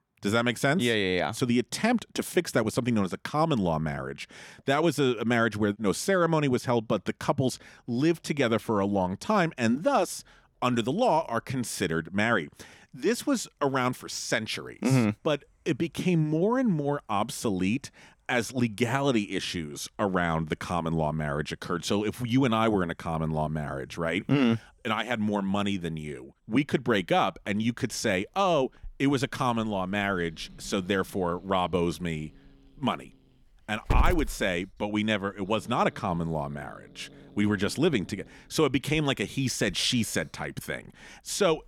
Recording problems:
animal sounds; noticeable; throughout; 15 dB below the speech

